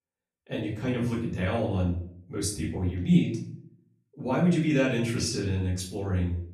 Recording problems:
off-mic speech; far
room echo; noticeable; dies away in 0.5 s

